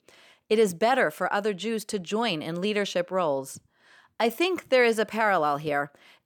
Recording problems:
none

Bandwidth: 18.5 kHz